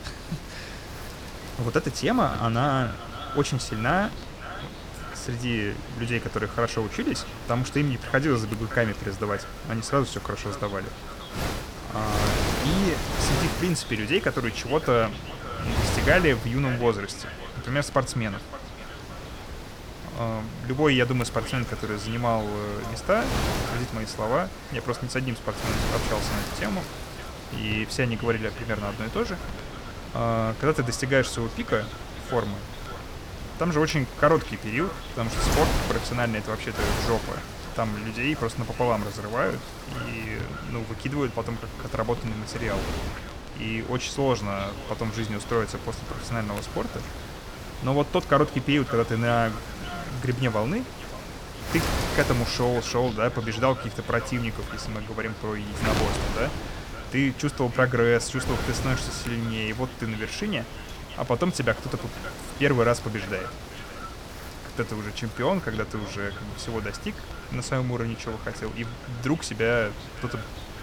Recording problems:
echo of what is said; noticeable; throughout; 570 ms later, 15 dB below the speech
wind noise on the microphone; heavy; 8 dB below the speech

